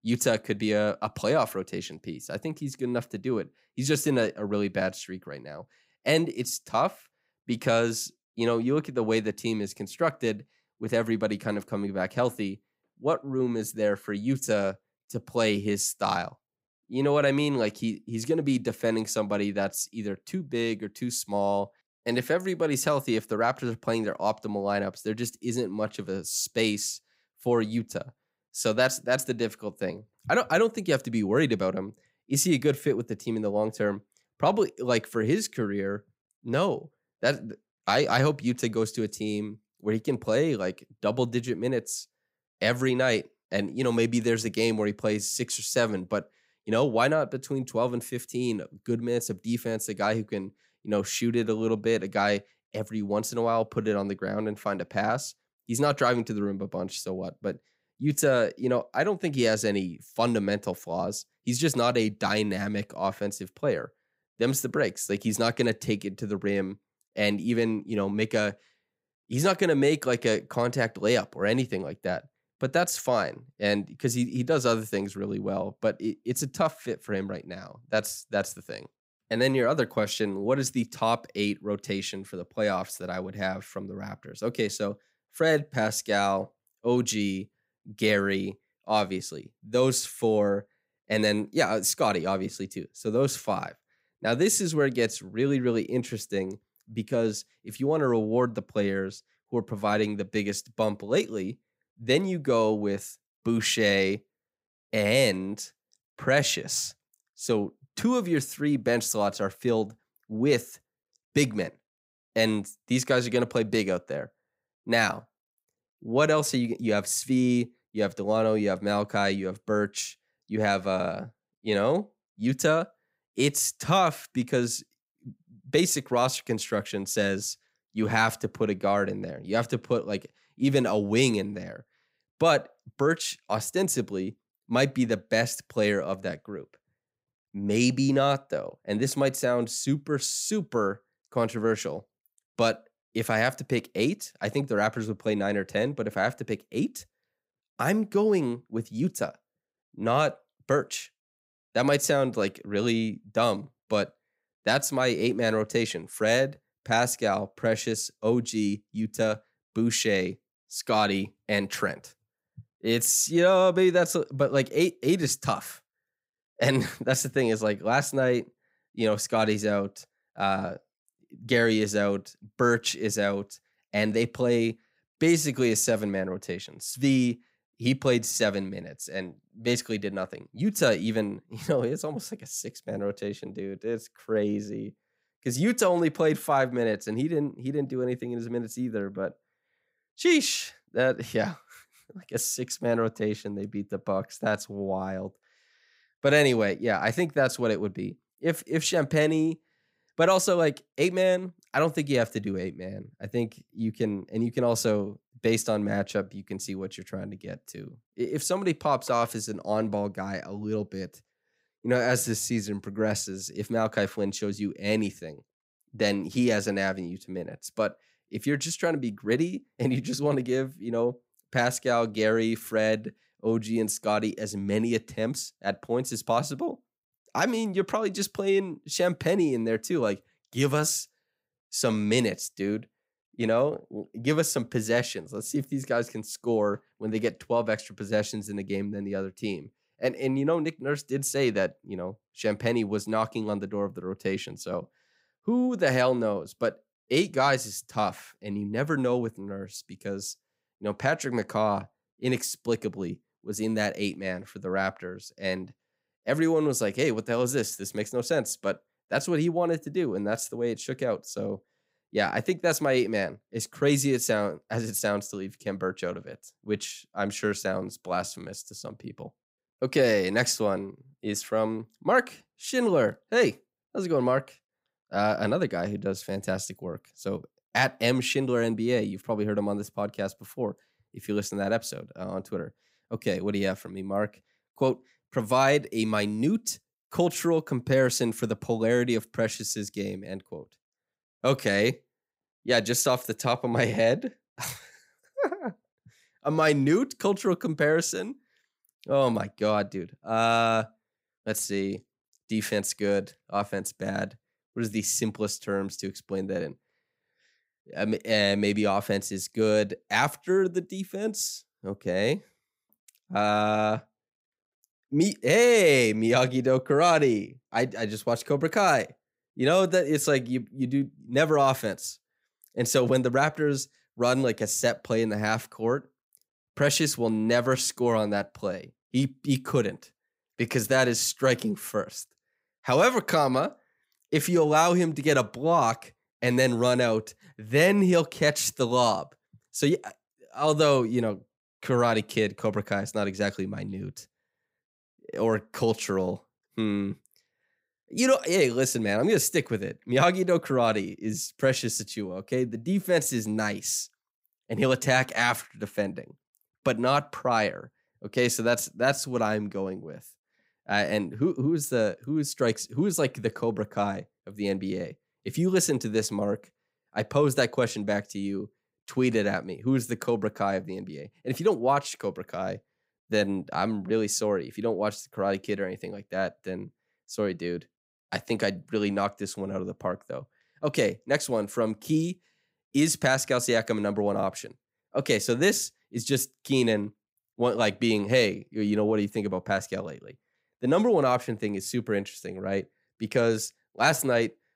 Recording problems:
none

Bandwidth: 15.5 kHz